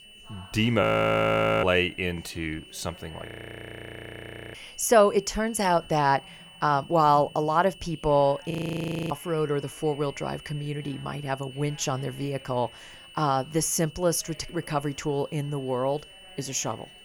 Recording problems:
high-pitched whine; faint; throughout; 3 kHz, 20 dB below the speech
chatter from many people; faint; throughout; 25 dB below the speech
audio freezing; at 1 s for 1 s, at 3.5 s for 1.5 s and at 8.5 s for 0.5 s

